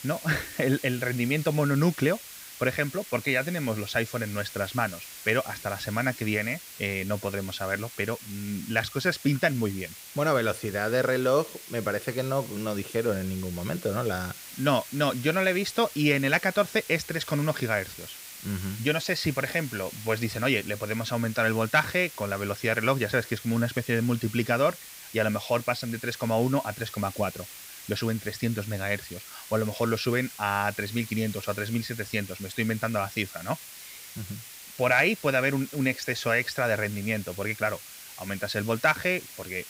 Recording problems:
hiss; noticeable; throughout; 15 dB below the speech

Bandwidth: 15.5 kHz